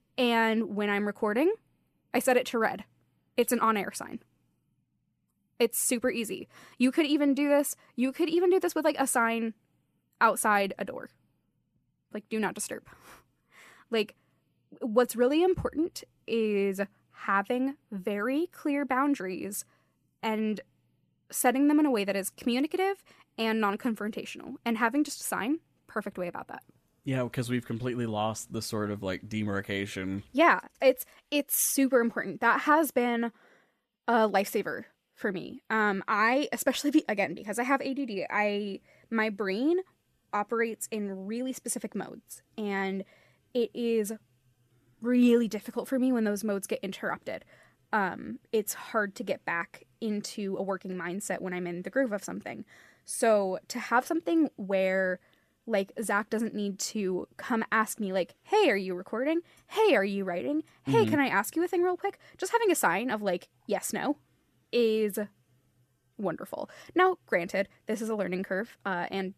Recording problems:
none

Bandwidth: 14.5 kHz